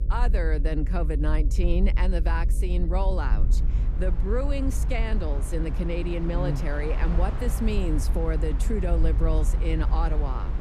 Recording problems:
electrical hum; noticeable; throughout; 50 Hz, 15 dB below the speech
train or aircraft noise; noticeable; from 3.5 s on; 10 dB below the speech
low rumble; noticeable; throughout; 15 dB below the speech

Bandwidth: 14 kHz